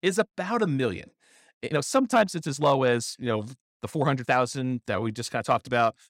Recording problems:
uneven, jittery; strongly; from 1.5 to 5.5 s

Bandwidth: 16 kHz